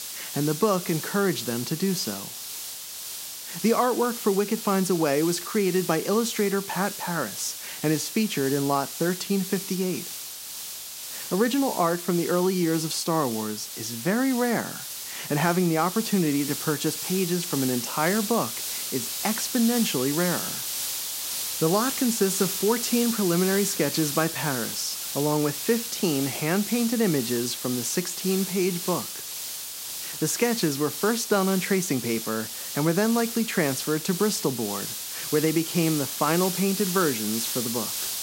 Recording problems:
hiss; loud; throughout; 5 dB below the speech

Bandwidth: 16 kHz